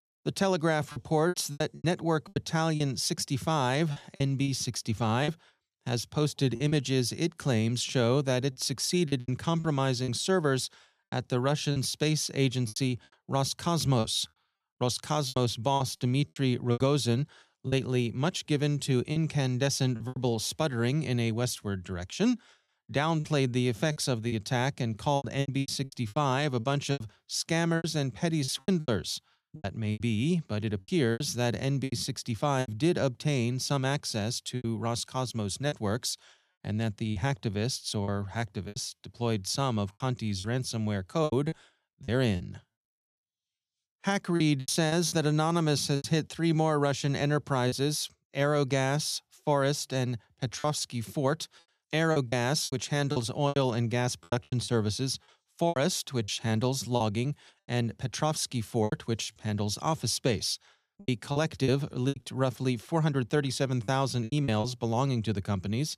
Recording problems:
choppy; very; 9% of the speech affected

